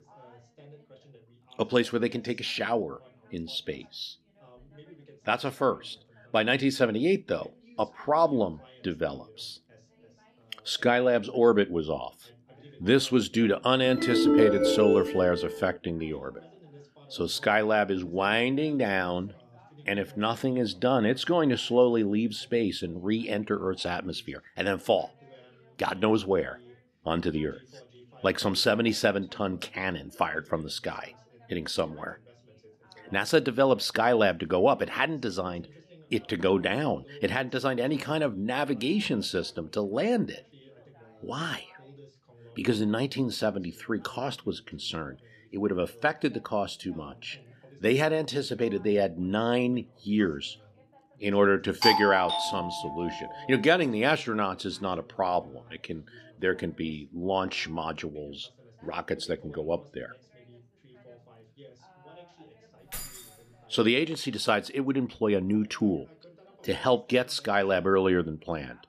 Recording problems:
background chatter; faint; throughout; 2 voices, 30 dB below the speech
phone ringing; loud; from 14 to 16 s; peak 6 dB above the speech
doorbell; loud; from 52 to 53 s; peak 4 dB above the speech
jangling keys; faint; at 1:03; peak 10 dB below the speech

